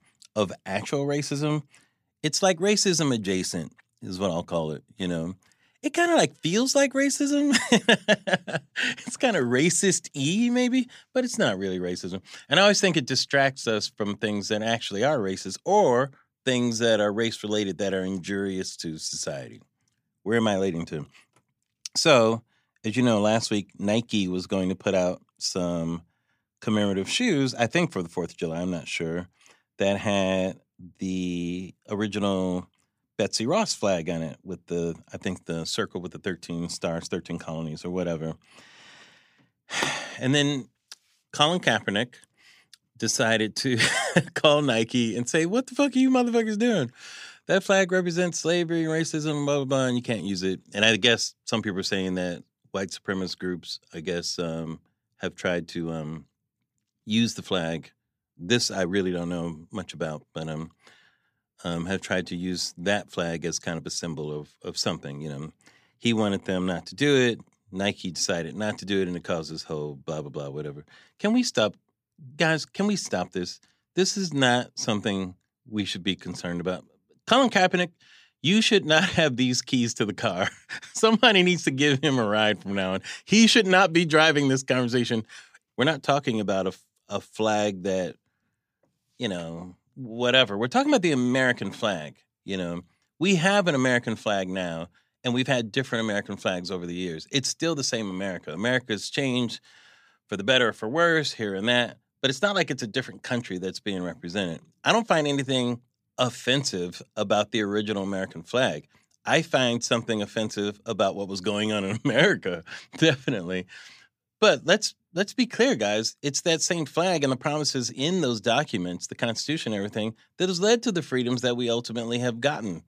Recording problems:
none

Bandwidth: 15 kHz